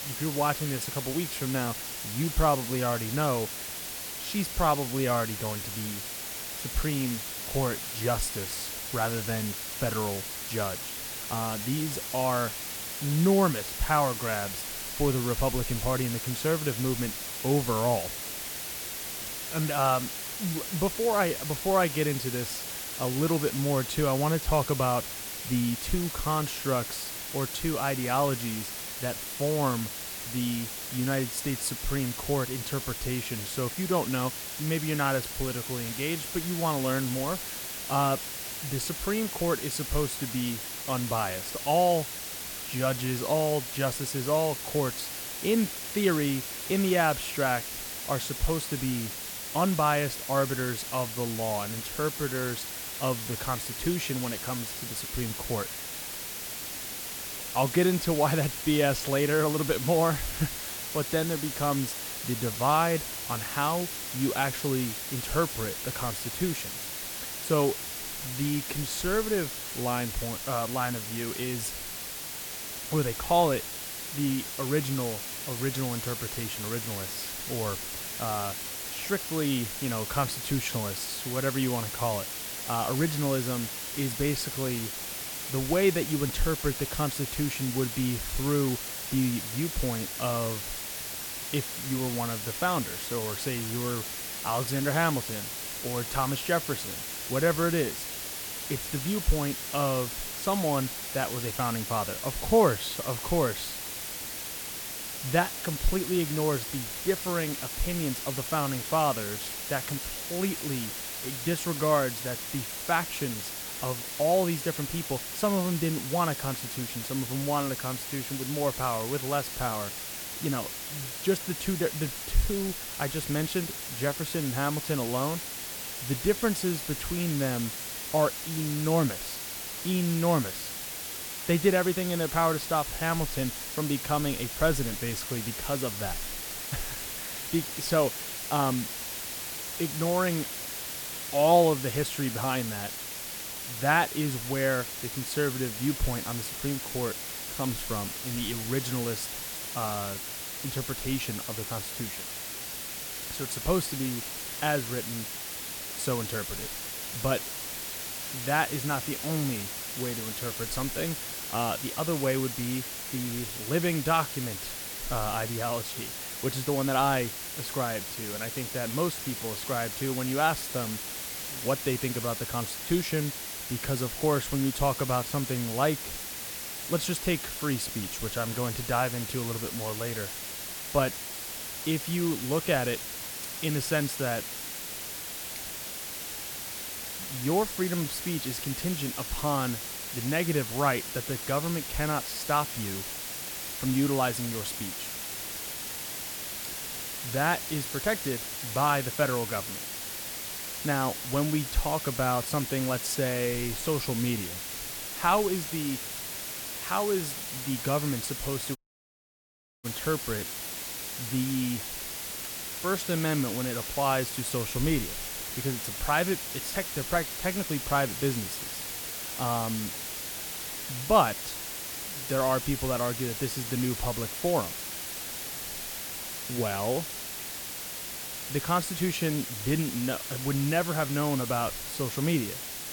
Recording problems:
hiss; loud; throughout; 4 dB below the speech
audio cutting out; at 3:29 for 1 s

